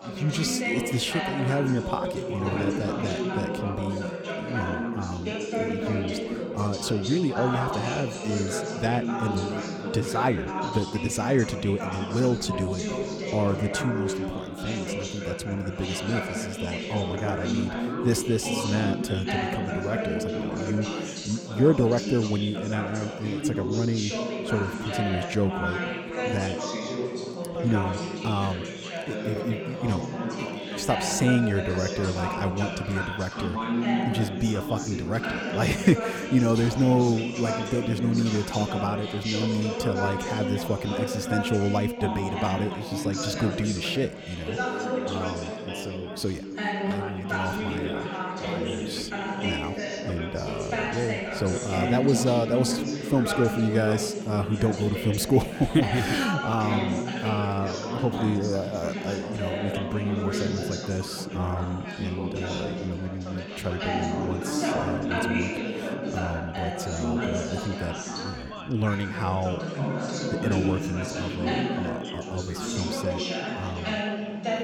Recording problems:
chatter from many people; loud; throughout; 2 dB below the speech

